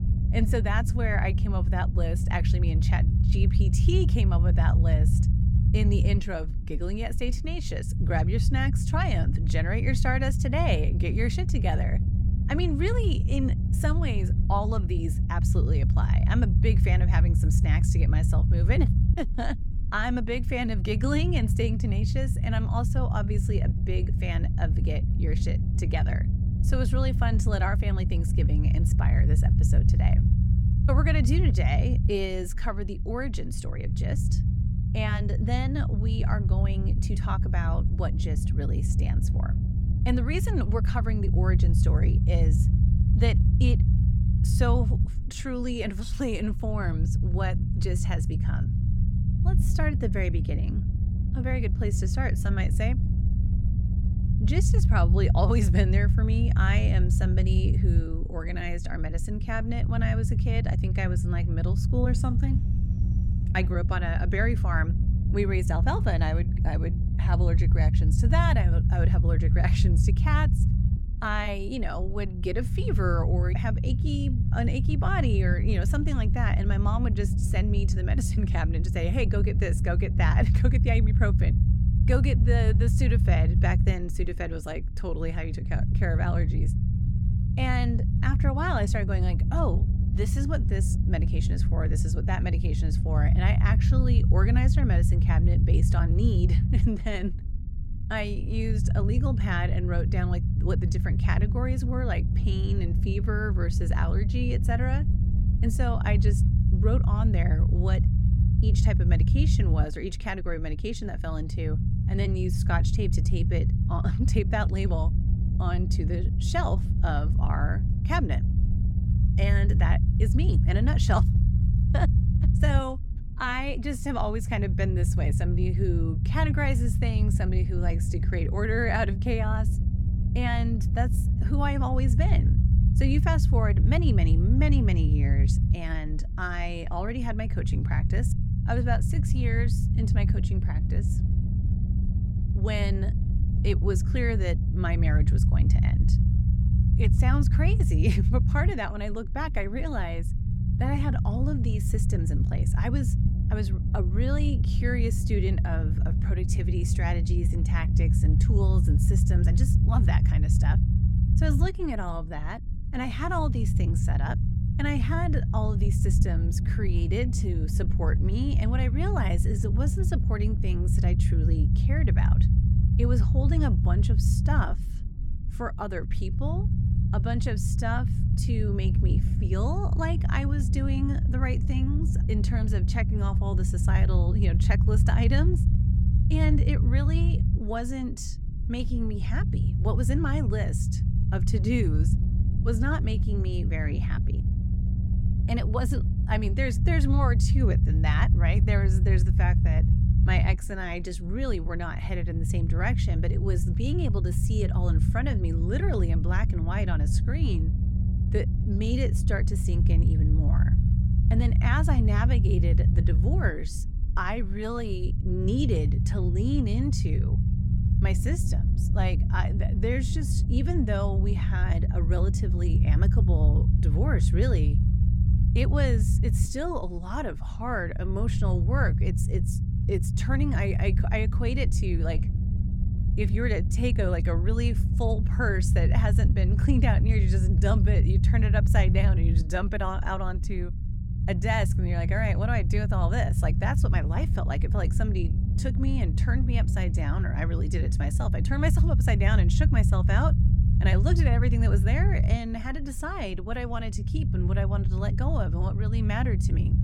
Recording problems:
low rumble; loud; throughout; 6 dB below the speech

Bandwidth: 17 kHz